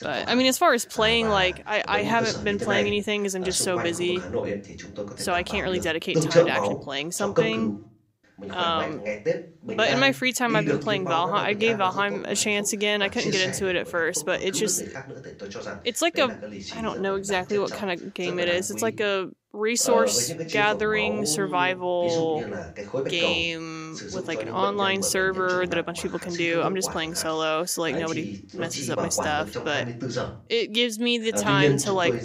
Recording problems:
voice in the background; loud; throughout; 6 dB below the speech

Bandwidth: 15.5 kHz